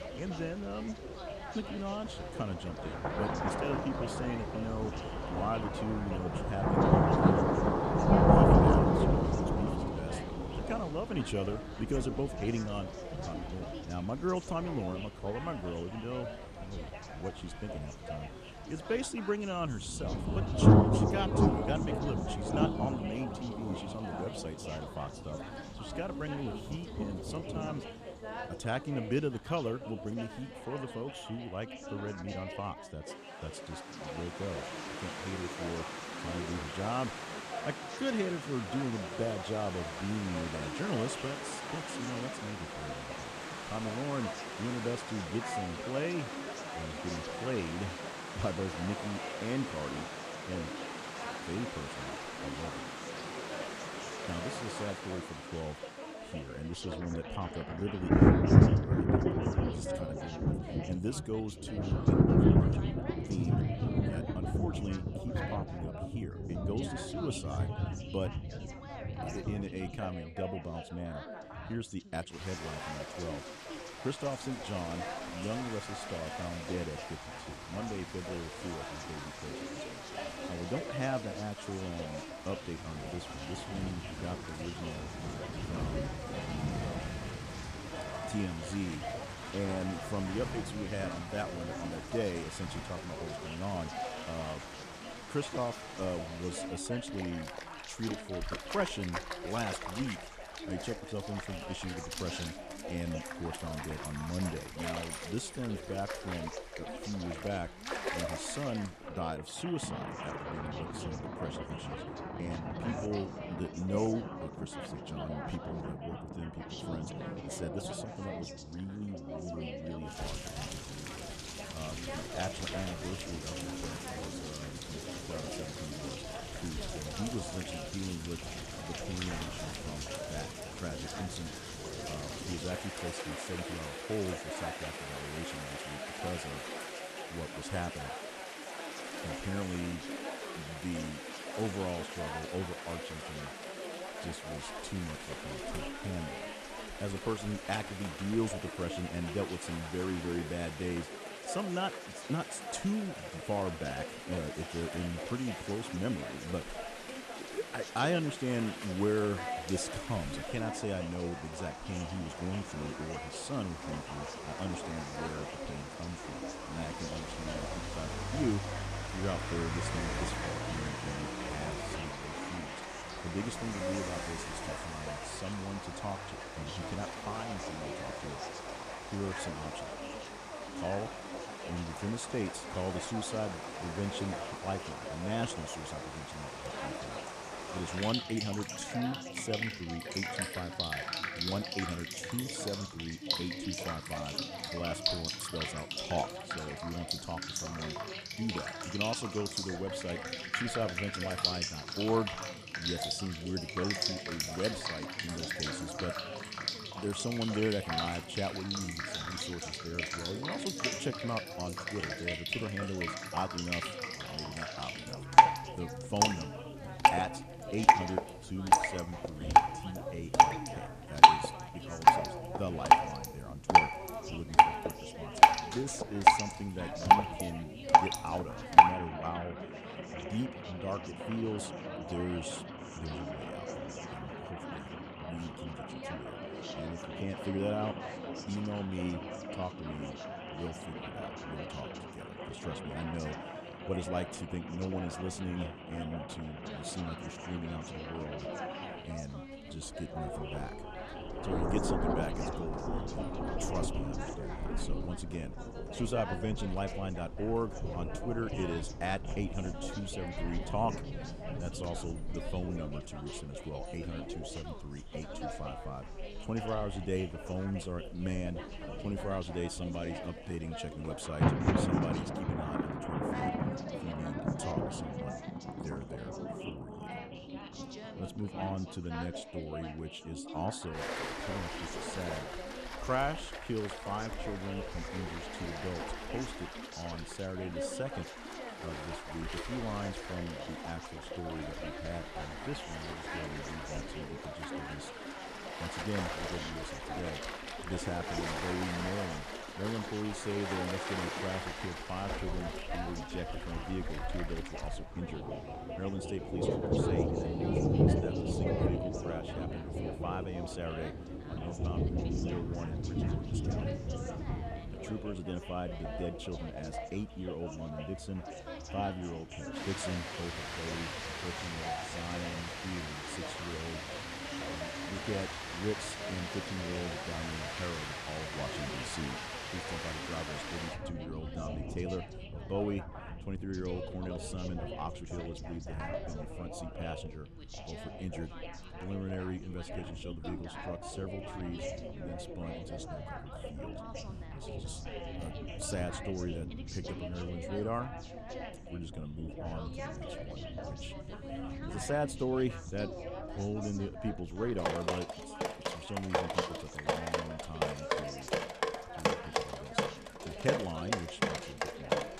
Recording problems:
rain or running water; very loud; throughout; 4 dB above the speech
background chatter; loud; throughout; 3 voices, 6 dB below the speech

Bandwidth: 14.5 kHz